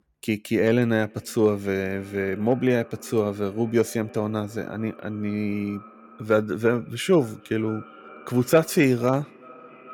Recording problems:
echo of what is said; faint; throughout; 440 ms later, 20 dB below the speech

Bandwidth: 17.5 kHz